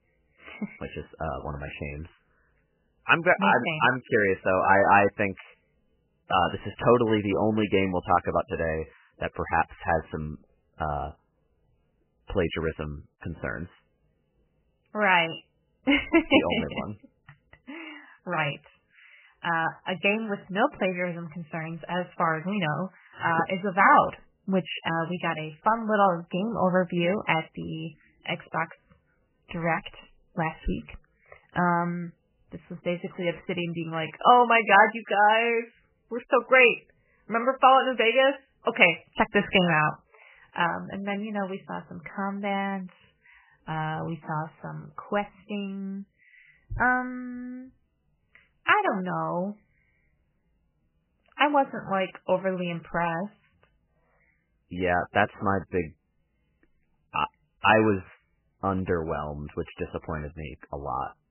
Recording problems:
garbled, watery; badly; nothing above 3 kHz

